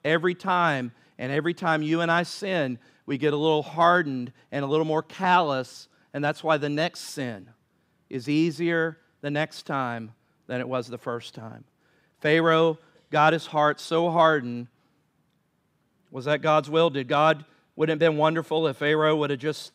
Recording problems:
none

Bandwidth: 15.5 kHz